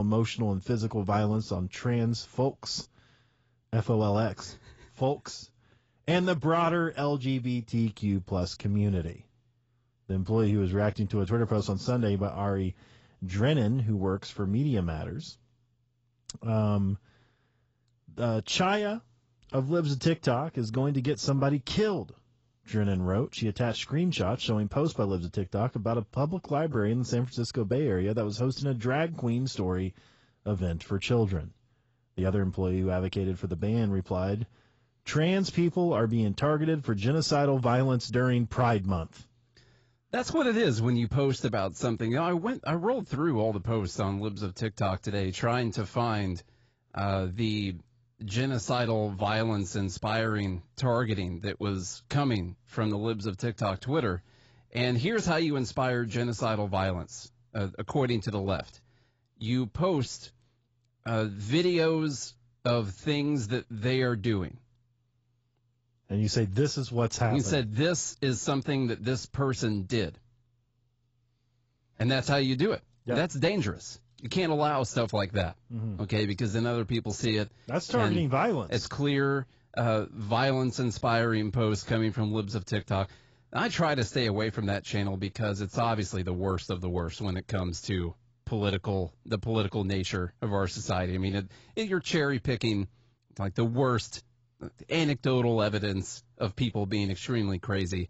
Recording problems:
garbled, watery; badly; nothing above 7.5 kHz
abrupt cut into speech; at the start

